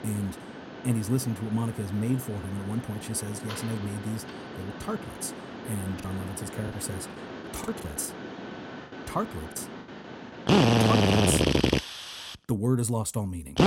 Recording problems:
machinery noise; very loud; throughout; 3 dB above the speech
choppy; very; from 6 to 9.5 s; 10% of the speech affected

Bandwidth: 16 kHz